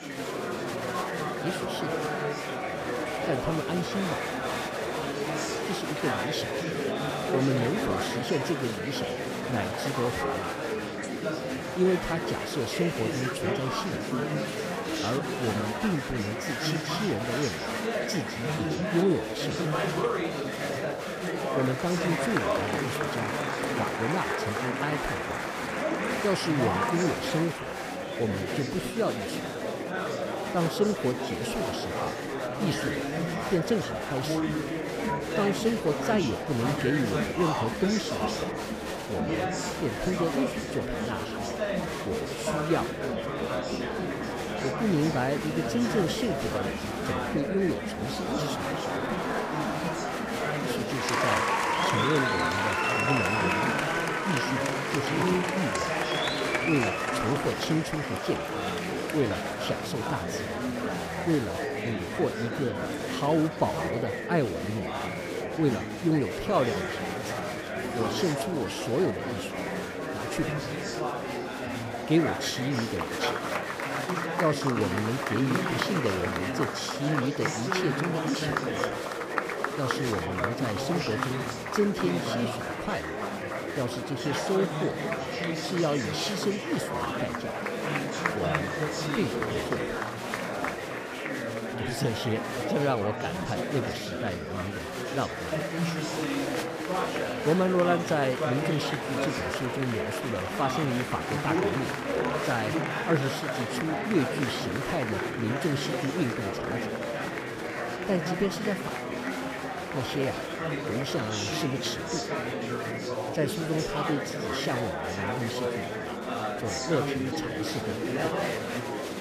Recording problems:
murmuring crowd; very loud; throughout; 1 dB above the speech

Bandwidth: 15 kHz